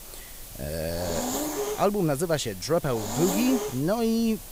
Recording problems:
hiss; loud; throughout; 6 dB below the speech

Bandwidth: 15.5 kHz